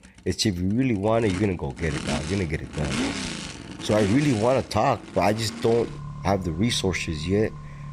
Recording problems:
traffic noise; loud; throughout; 9 dB below the speech

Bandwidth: 14.5 kHz